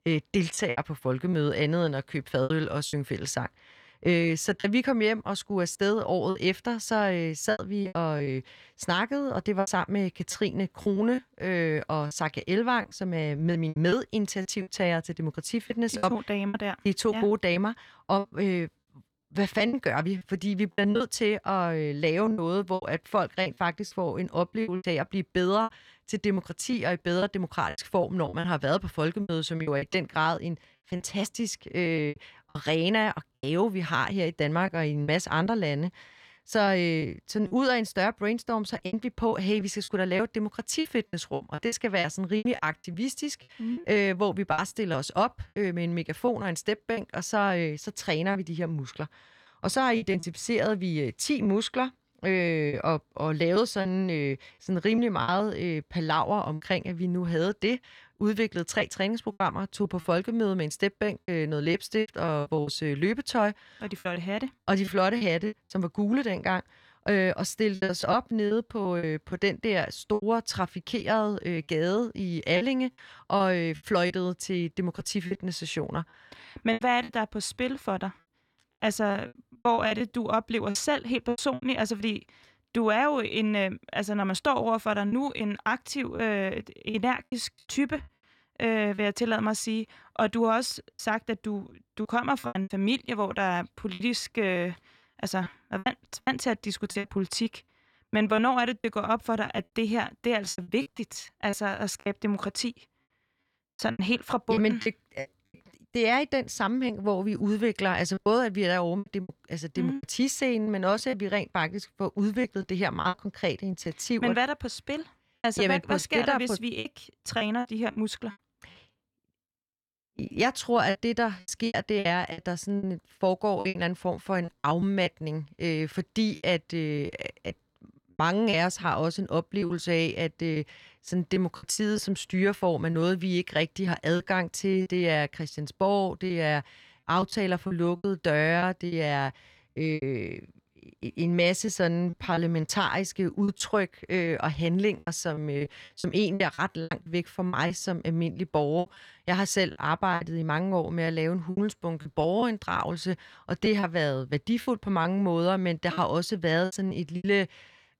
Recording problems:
choppy; very; 9% of the speech affected

